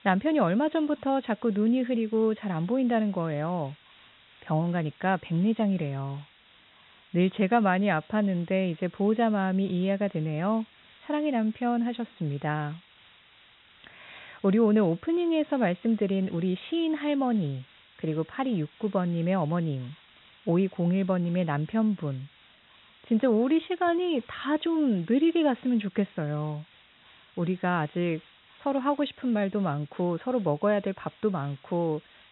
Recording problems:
high frequencies cut off; severe; nothing above 4 kHz
hiss; faint; throughout; 25 dB below the speech

